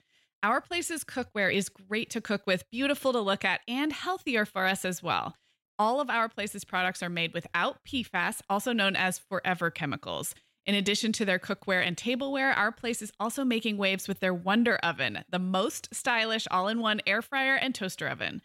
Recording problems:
none

